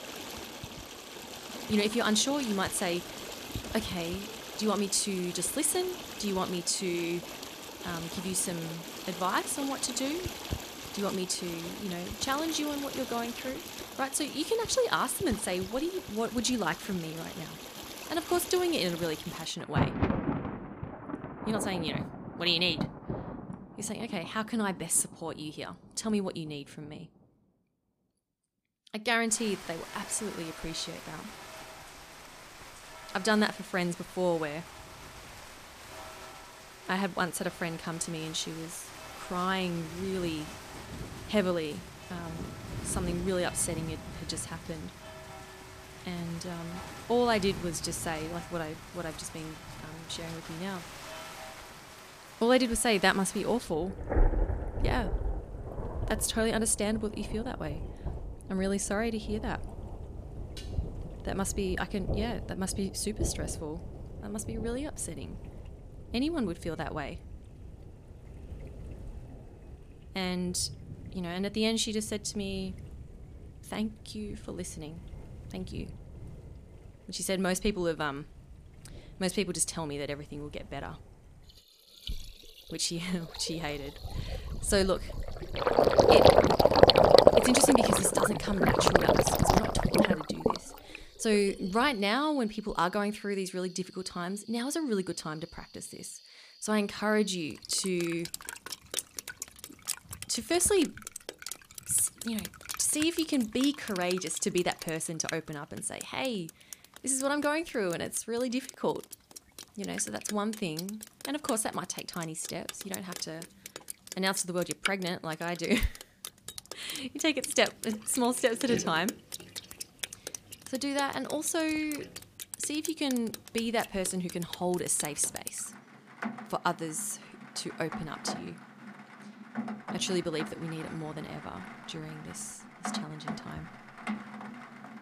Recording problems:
rain or running water; loud; throughout; 3 dB below the speech
clattering dishes; faint; at 1:01; peak 15 dB below the speech

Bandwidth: 15 kHz